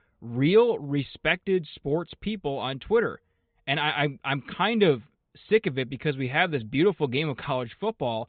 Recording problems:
high frequencies cut off; severe; nothing above 4 kHz

